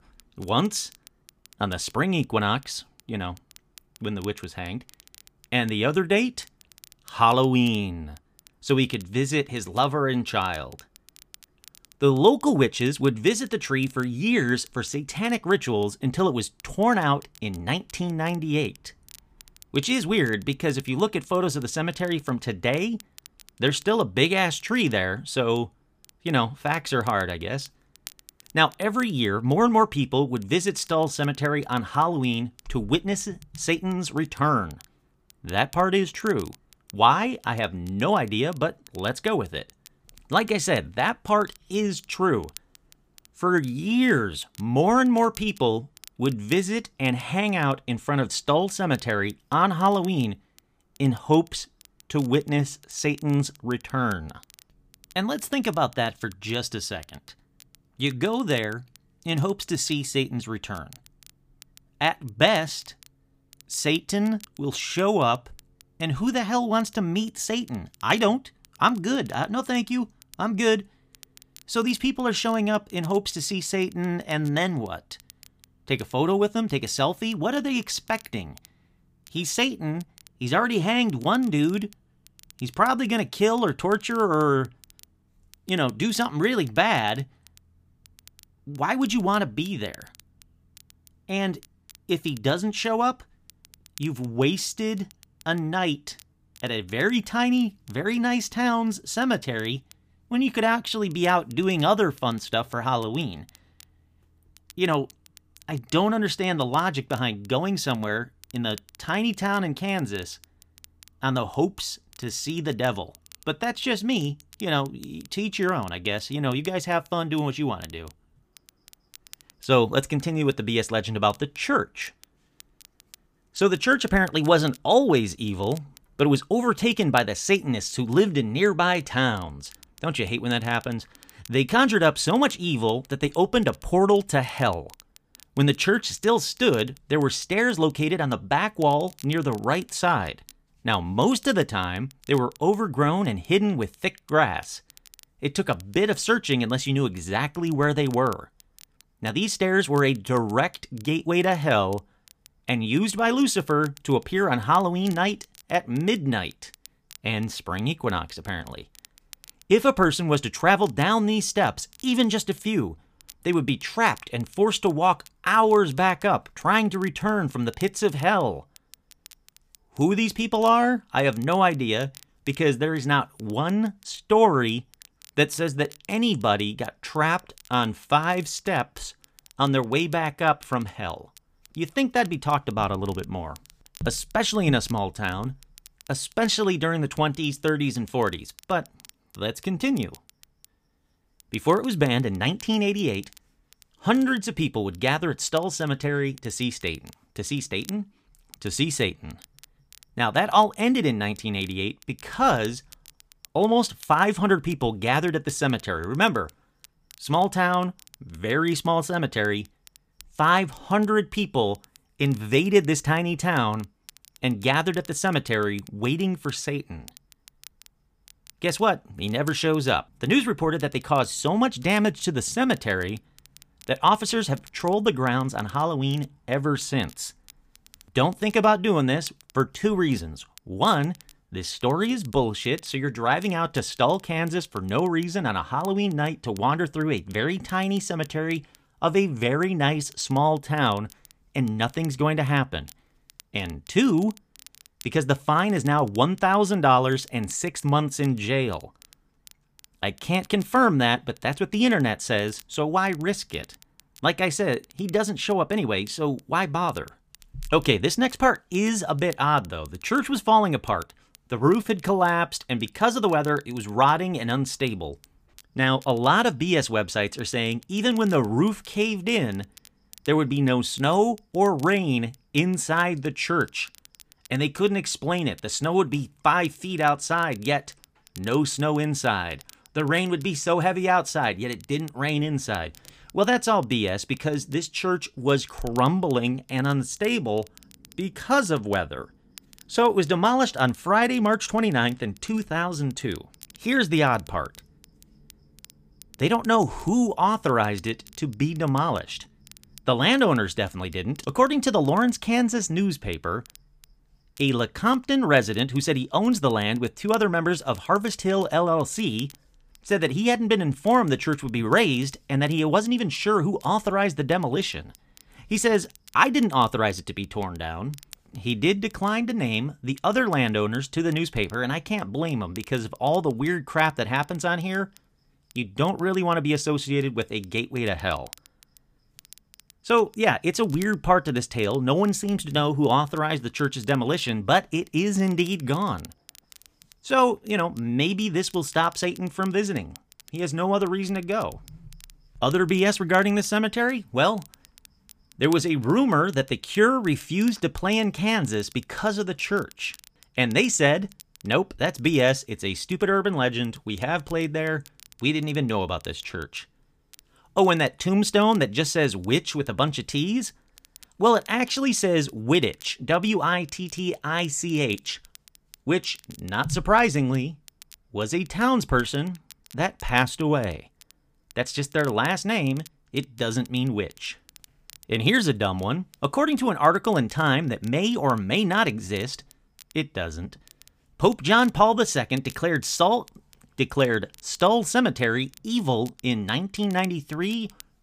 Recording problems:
crackle, like an old record; faint; 25 dB below the speech

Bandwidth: 15 kHz